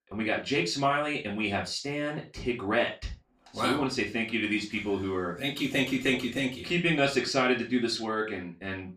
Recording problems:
off-mic speech; far
room echo; slight; dies away in 0.2 s

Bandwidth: 15 kHz